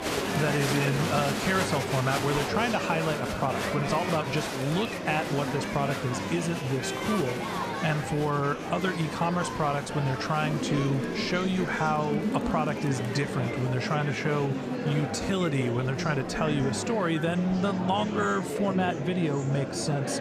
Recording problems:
murmuring crowd; loud; throughout; 3 dB below the speech

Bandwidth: 14.5 kHz